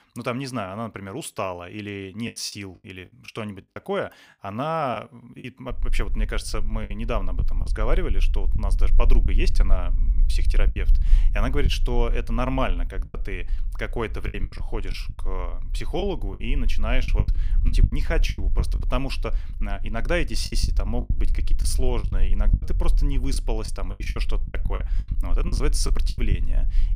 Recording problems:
low rumble; noticeable; from 5.5 s on; 15 dB below the speech
choppy; very; 9% of the speech affected

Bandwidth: 15.5 kHz